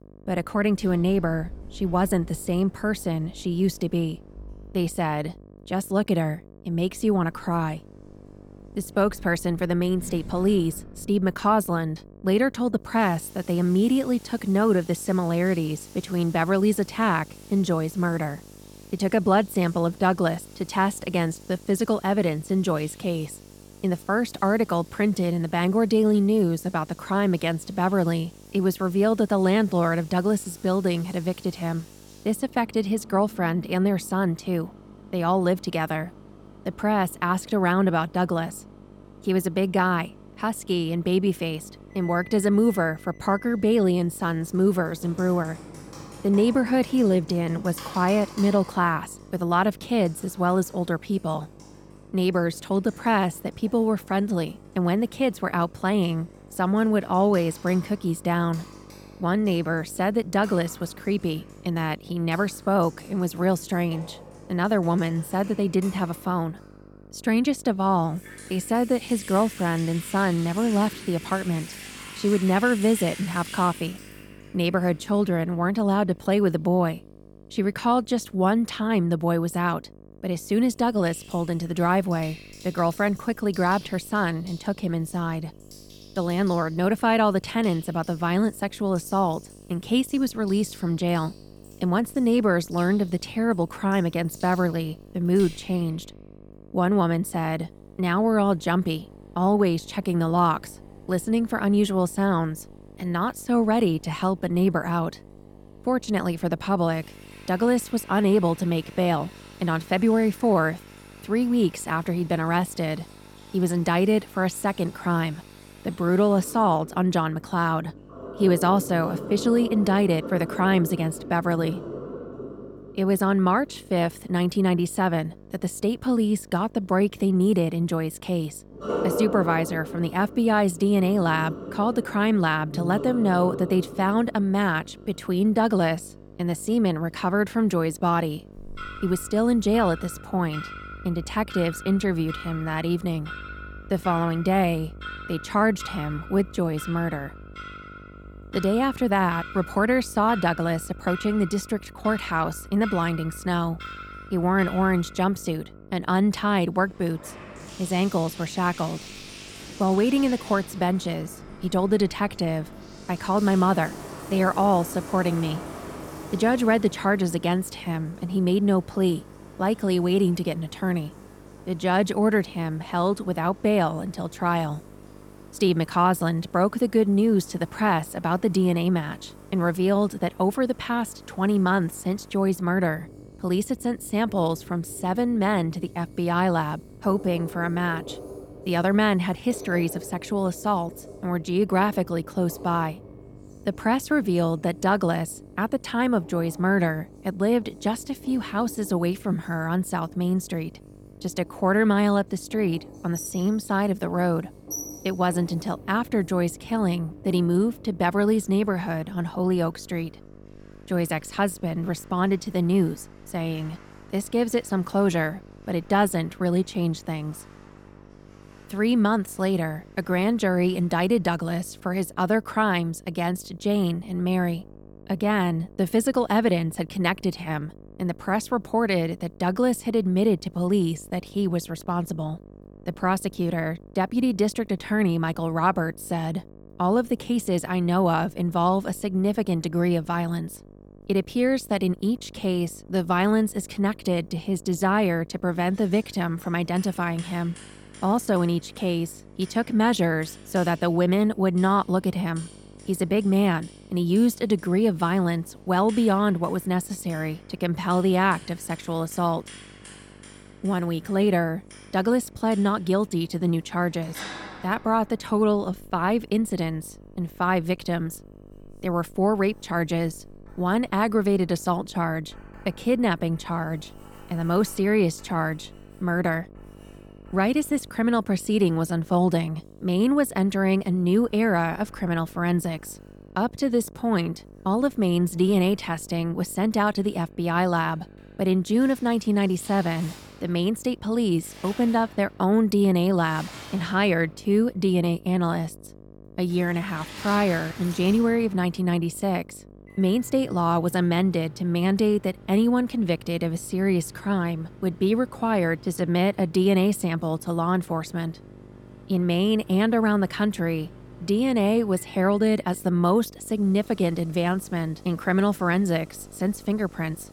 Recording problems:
household noises; noticeable; throughout; 20 dB below the speech
electrical hum; faint; throughout; 50 Hz, 25 dB below the speech

